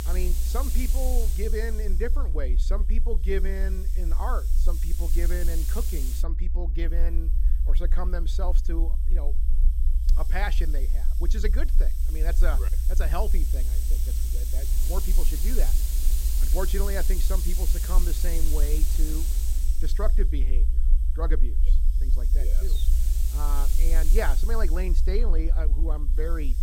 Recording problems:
hiss; loud; throughout; 3 dB below the speech
low rumble; noticeable; throughout; 15 dB below the speech

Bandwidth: 16 kHz